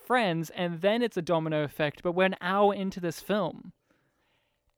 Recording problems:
none

